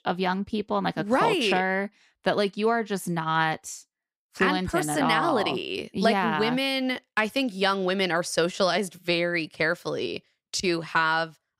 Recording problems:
none

